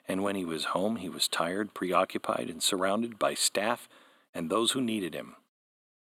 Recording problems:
thin; somewhat; fading below 300 Hz

